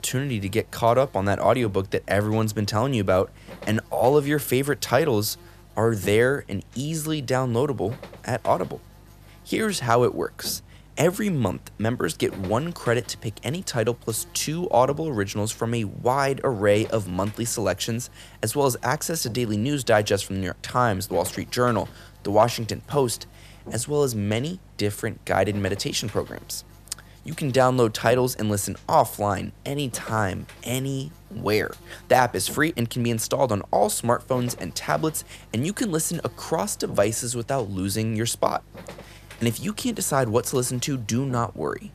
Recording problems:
electrical hum; faint; throughout; 50 Hz, 25 dB below the speech

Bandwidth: 14.5 kHz